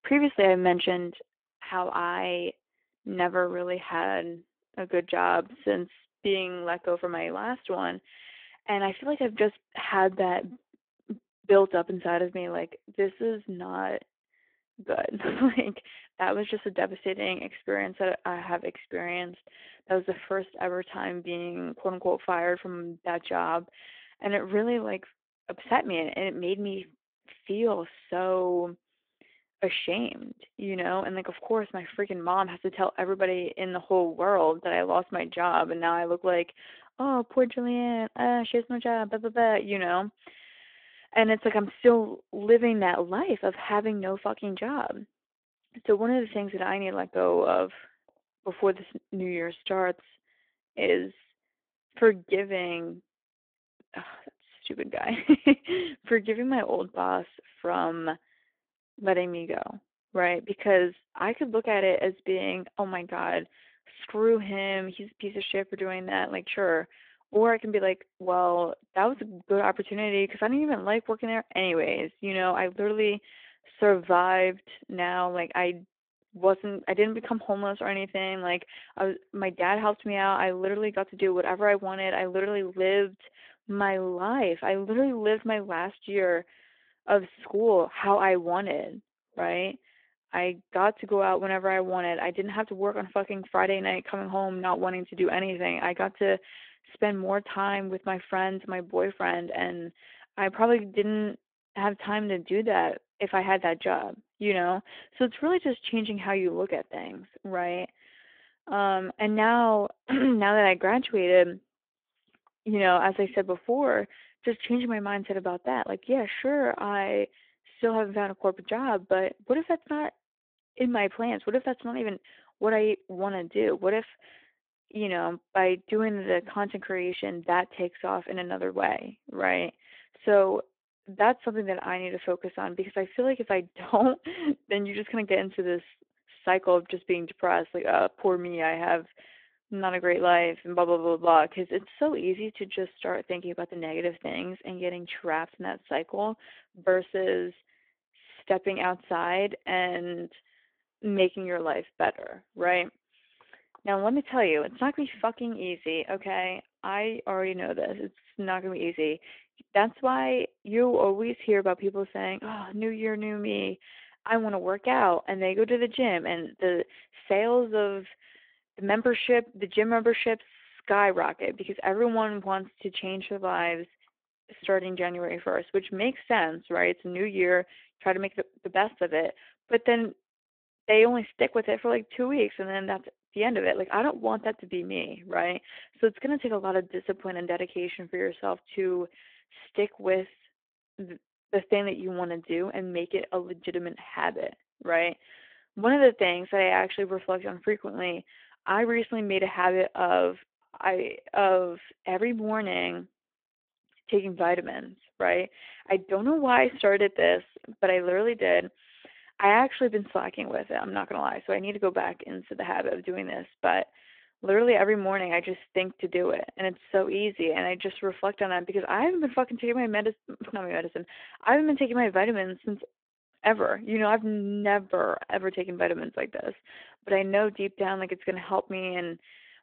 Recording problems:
phone-call audio

